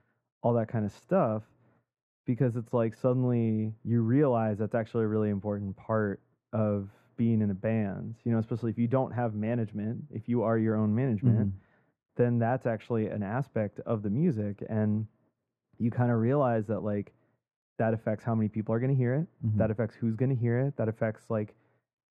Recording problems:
muffled; very; fading above 3.5 kHz

